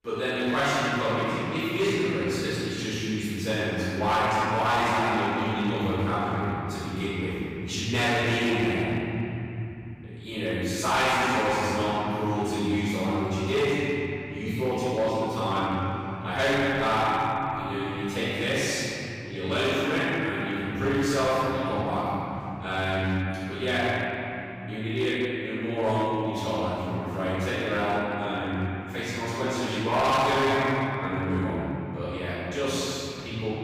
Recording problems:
room echo; strong; dies away in 3 s
off-mic speech; far
distortion; slight; 7% of the sound clipped

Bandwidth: 15.5 kHz